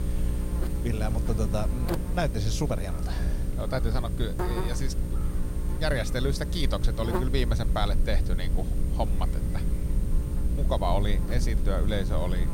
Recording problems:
electrical hum; loud; throughout; 60 Hz, 8 dB below the speech
low rumble; noticeable; throughout; 15 dB below the speech

